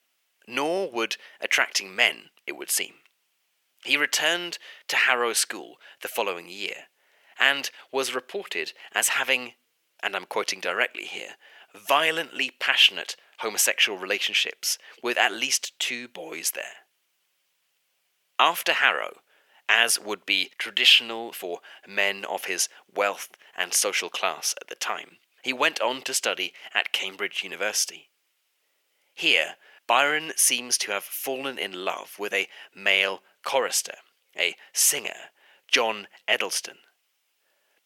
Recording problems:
thin; very; fading below 500 Hz

